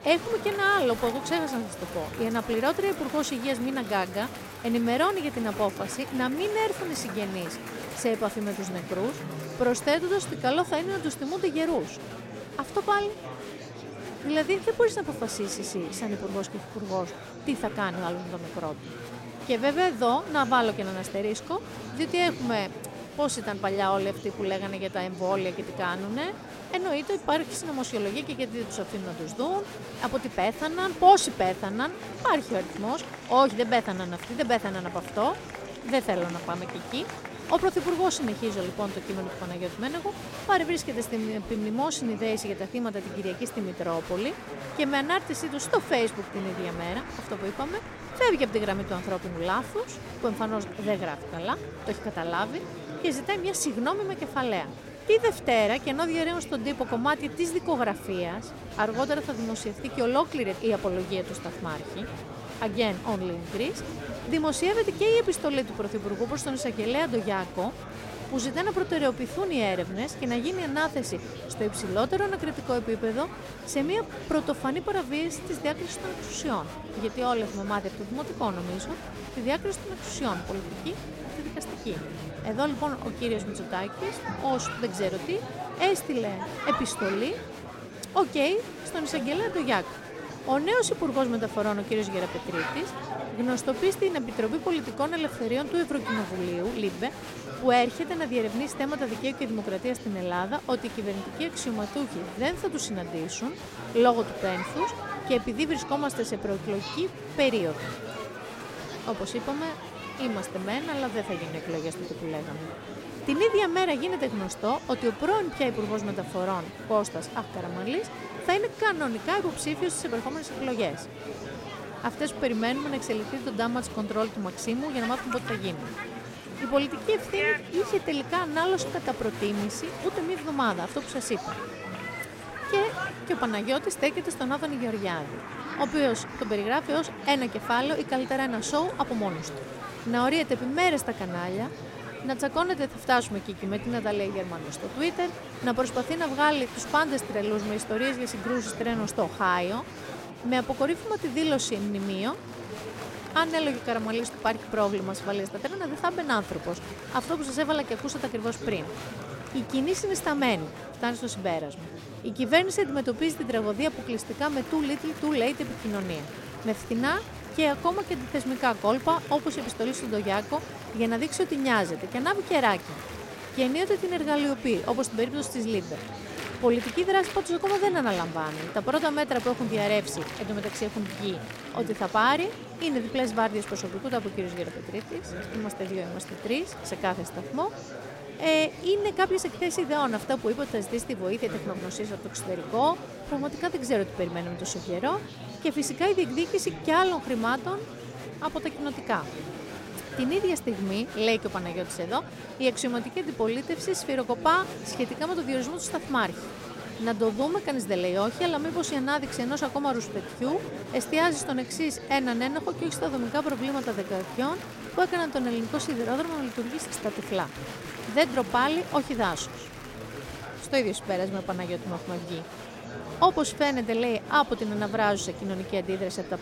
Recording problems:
murmuring crowd; loud; throughout; 10 dB below the speech

